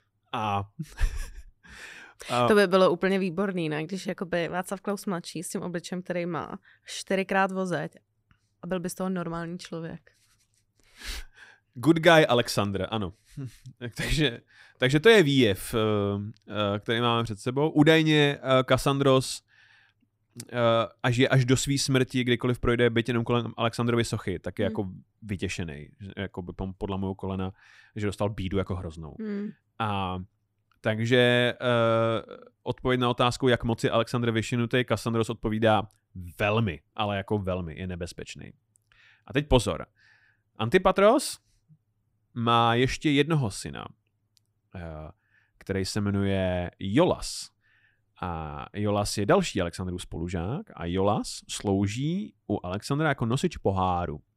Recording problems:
none

